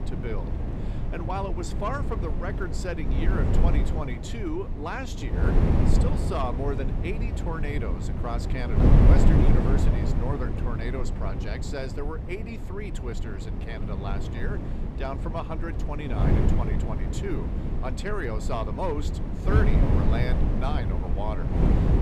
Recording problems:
wind noise on the microphone; heavy; 1 dB below the speech

